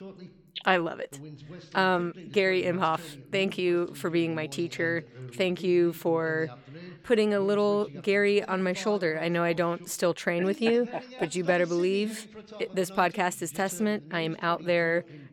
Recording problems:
voice in the background; noticeable; throughout; 20 dB below the speech

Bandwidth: 18 kHz